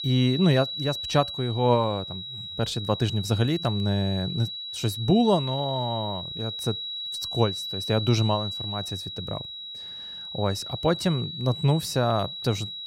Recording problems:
high-pitched whine; loud; throughout; 4 kHz, 6 dB below the speech

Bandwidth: 16 kHz